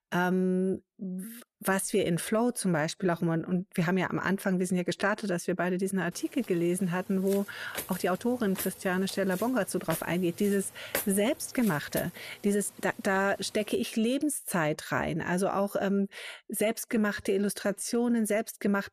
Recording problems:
uneven, jittery; strongly; from 1 to 18 s
footsteps; noticeable; from 7.5 to 12 s; peak 4 dB below the speech

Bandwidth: 14.5 kHz